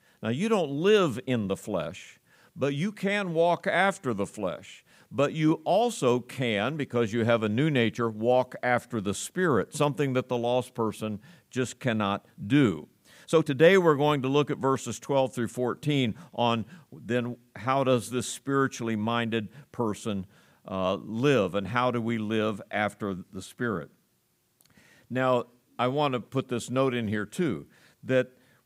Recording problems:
uneven, jittery; slightly; from 1.5 to 14 s

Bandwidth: 15.5 kHz